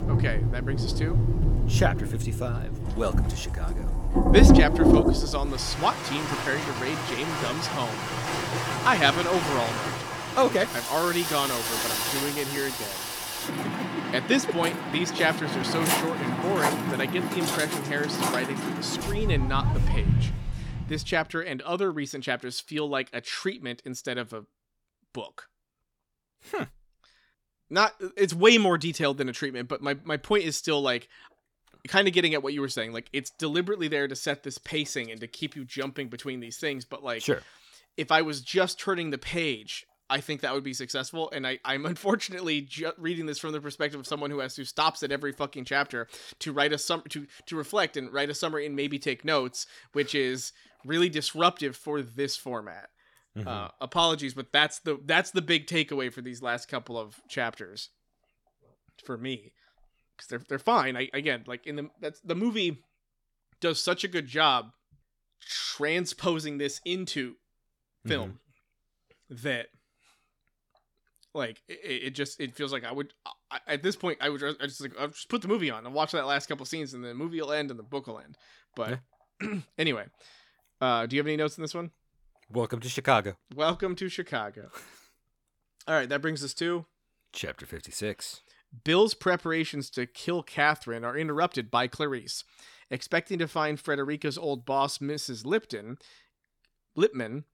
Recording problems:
rain or running water; very loud; until 21 s; 2 dB above the speech

